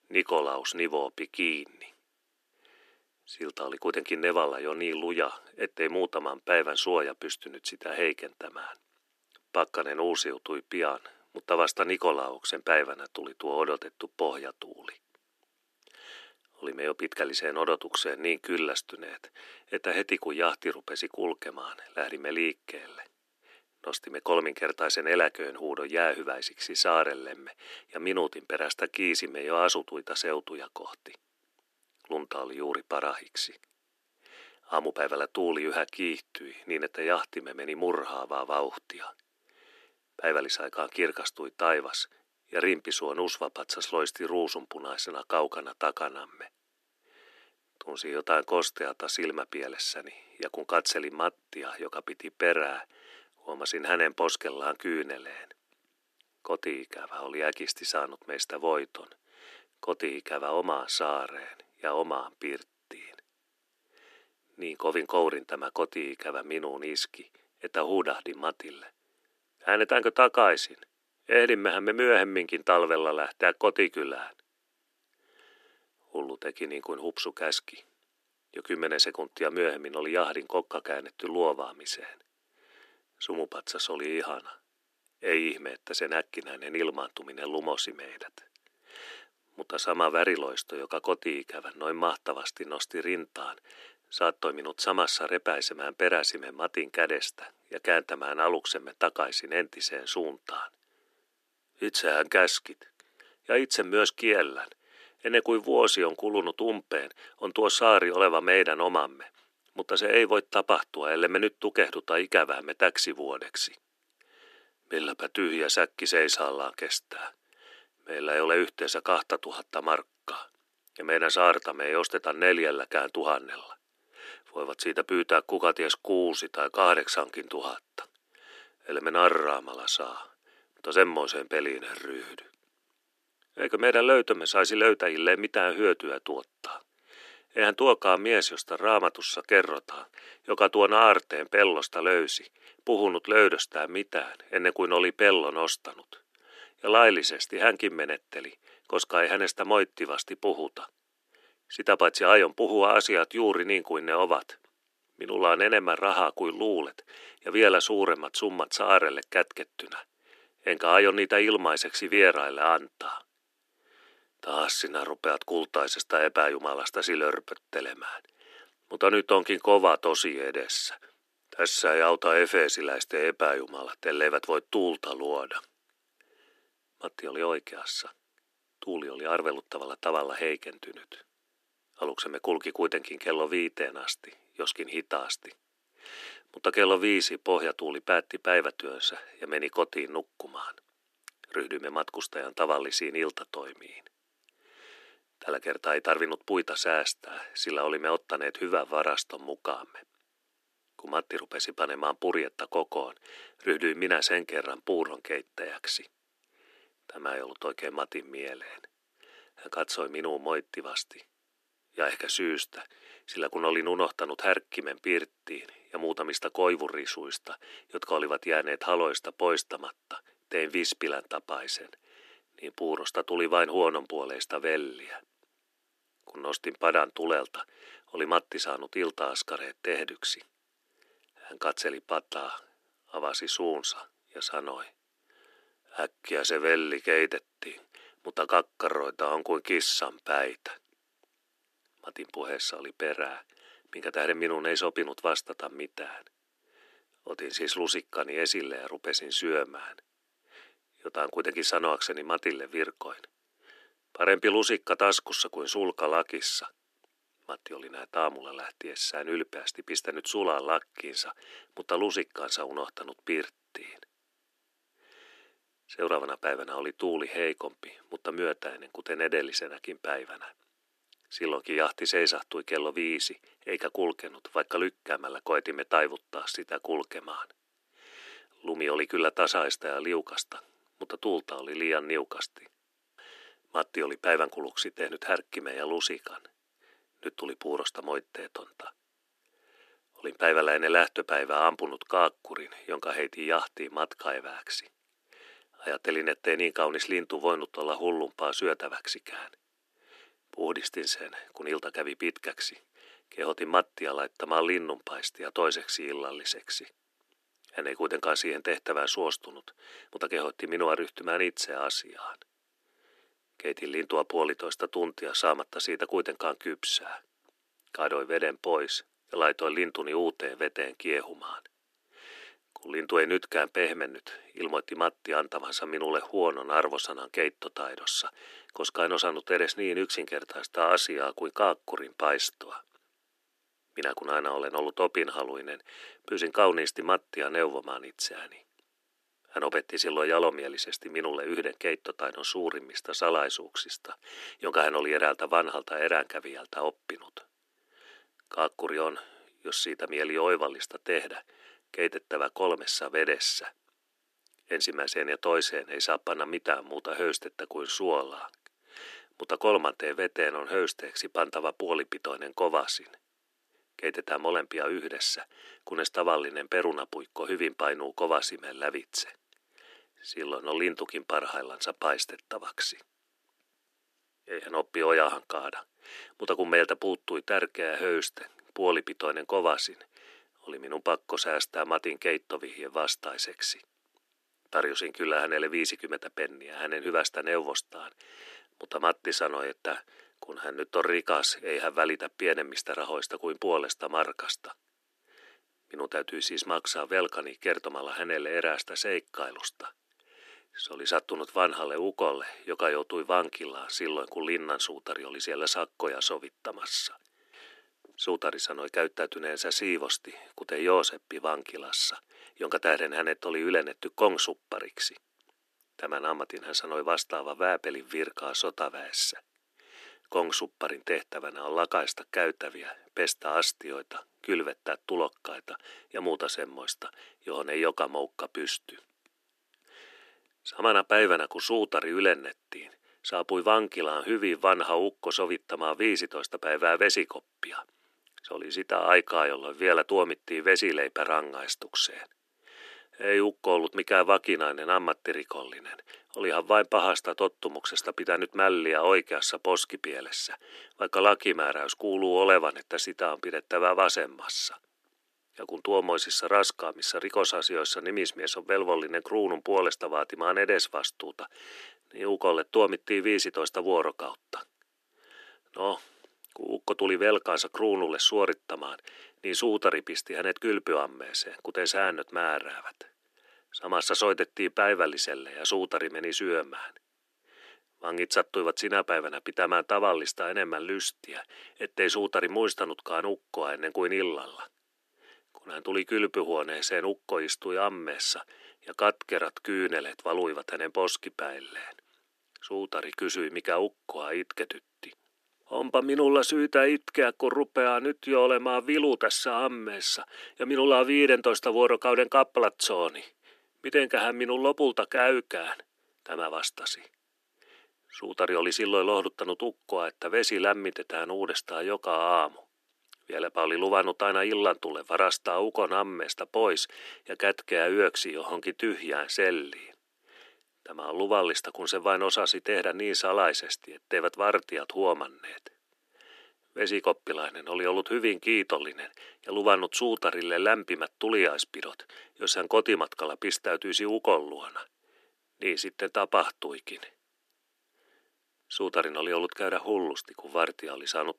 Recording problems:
thin; somewhat; fading below 300 Hz

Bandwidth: 13.5 kHz